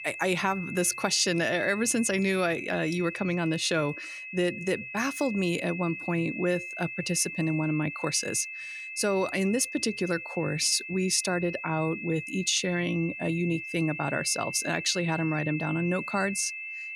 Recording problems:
high-pitched whine; loud; throughout; 2.5 kHz, 8 dB below the speech

